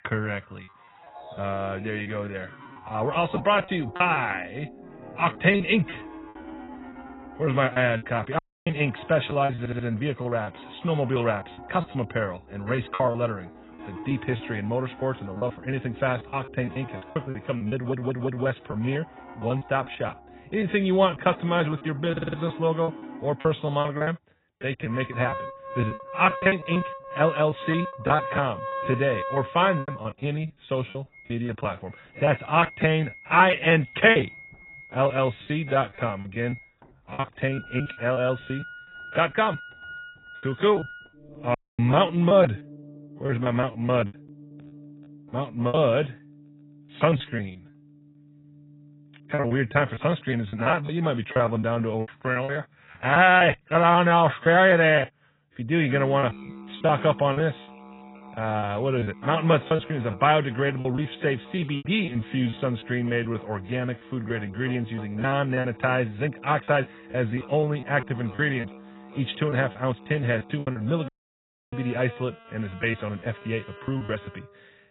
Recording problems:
garbled, watery; badly; nothing above 4 kHz
background music; noticeable; throughout; 15 dB below the speech
choppy; very; 13% of the speech affected
audio cutting out; at 8.5 s, at 42 s and at 1:11 for 0.5 s
audio stuttering; at 9.5 s, at 18 s and at 22 s

